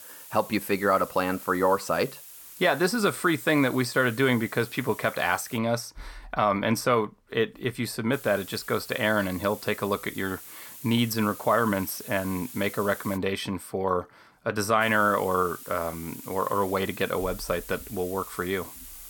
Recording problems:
hiss; noticeable; until 5.5 s, from 8 to 13 s and from 15 s on; 15 dB below the speech

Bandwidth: 17.5 kHz